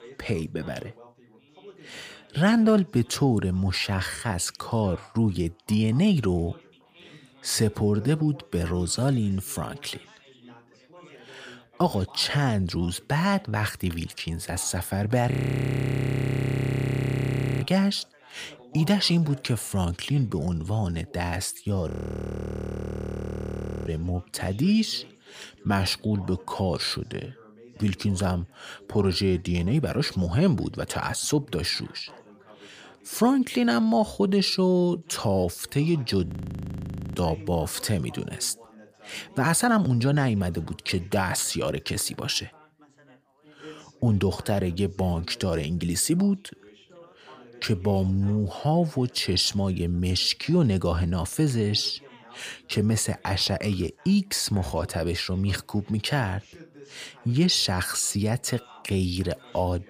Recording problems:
background chatter; faint; throughout; 3 voices, 25 dB below the speech
audio freezing; at 15 s for 2.5 s, at 22 s for 2 s and at 36 s for 1 s

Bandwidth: 15 kHz